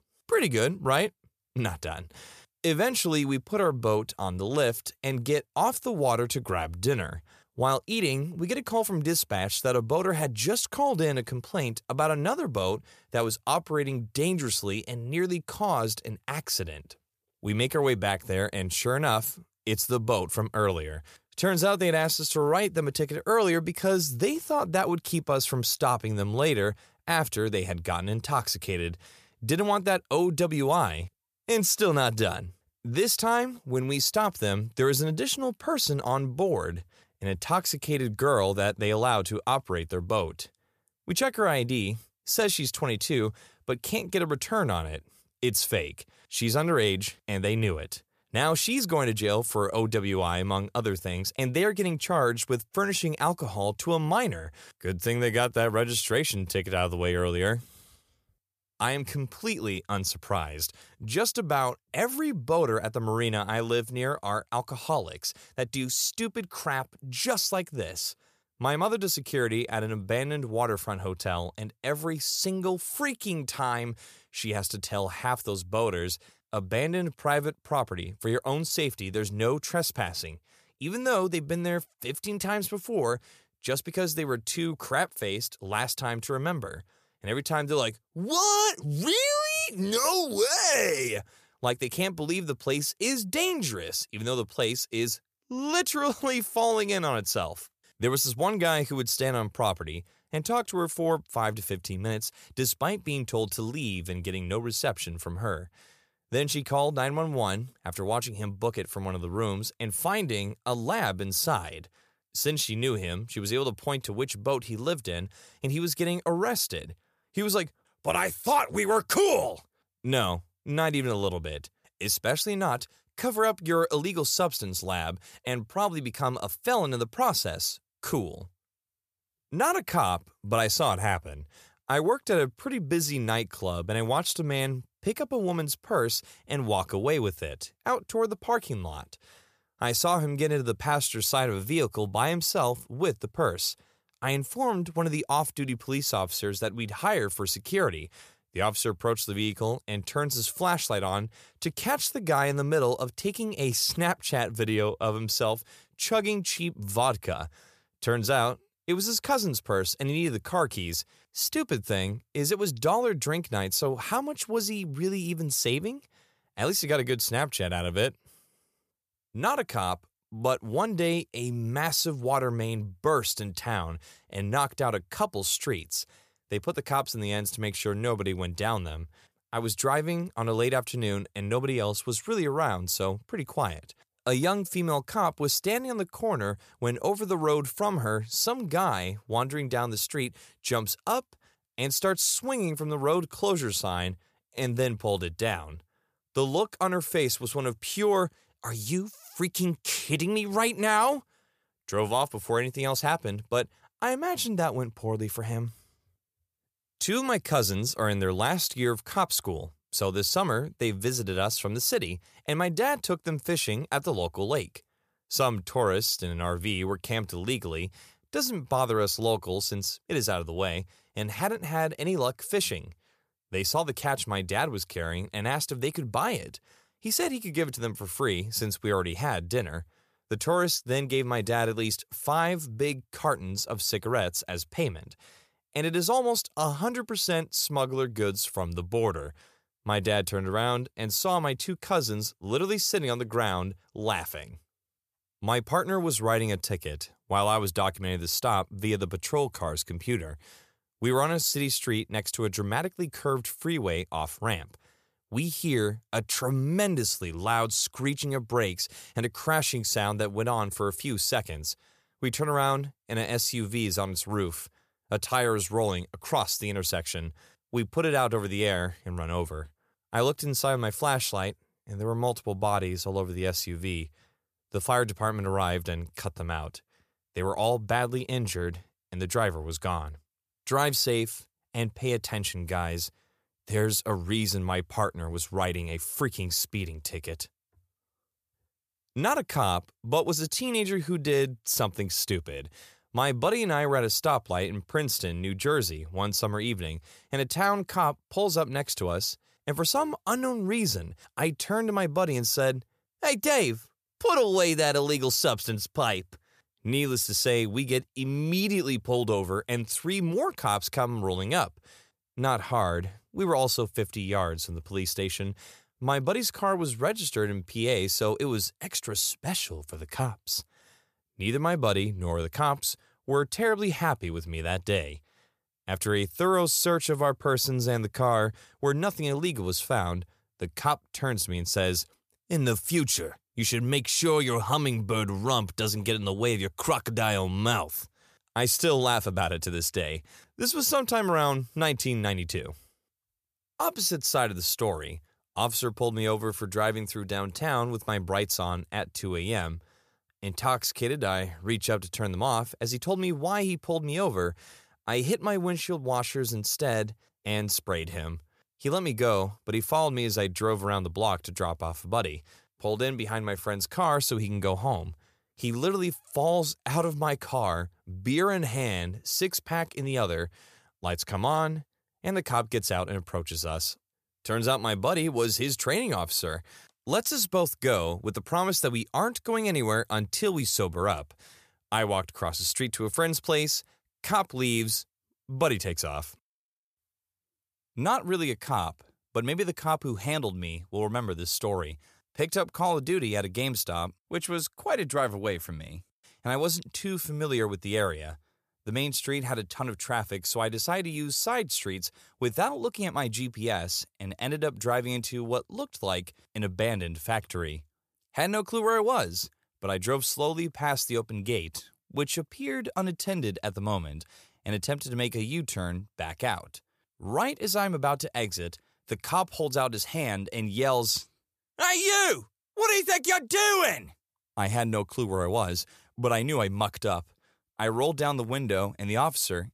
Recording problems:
none

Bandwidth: 14.5 kHz